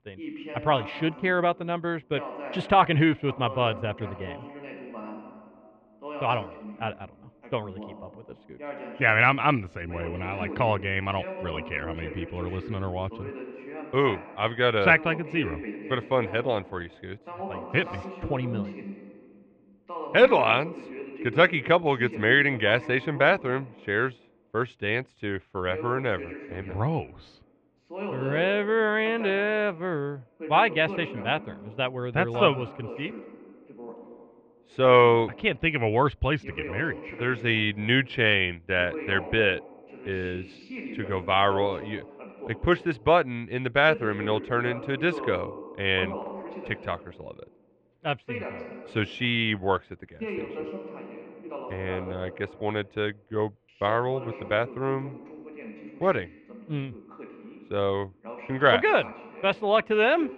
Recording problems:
muffled; very; fading above 2.5 kHz
voice in the background; noticeable; throughout; 15 dB below the speech

